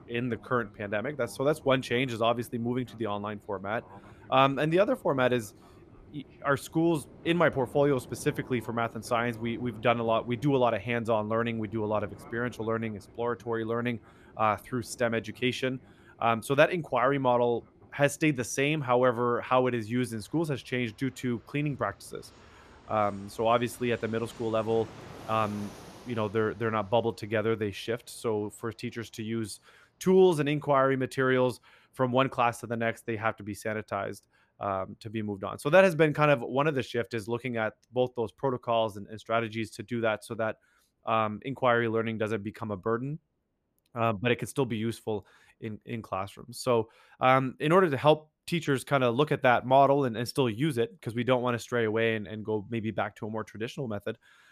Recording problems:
train or aircraft noise; faint; throughout; 25 dB below the speech

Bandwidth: 14.5 kHz